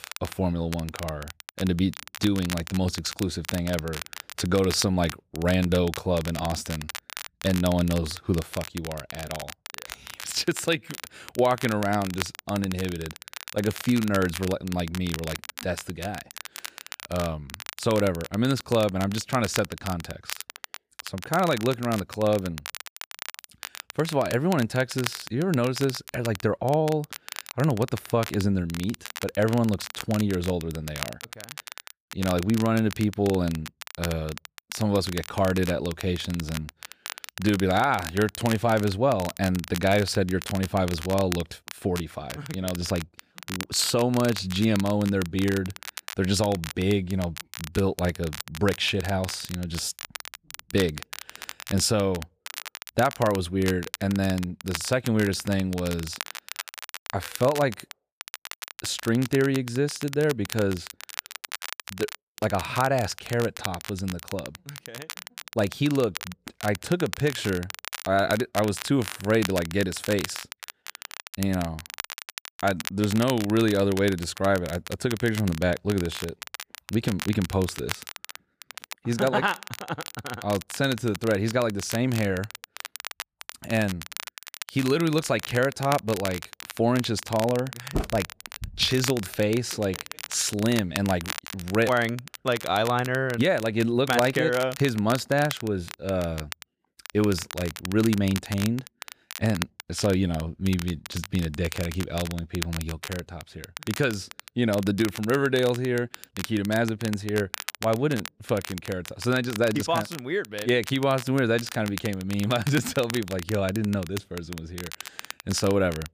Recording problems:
crackle, like an old record; noticeable; 10 dB below the speech

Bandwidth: 15 kHz